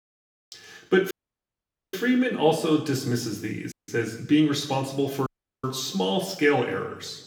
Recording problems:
room echo; slight; dies away in 0.9 s
off-mic speech; somewhat distant
audio cutting out; at 1 s for 1 s, at 3.5 s and at 5.5 s

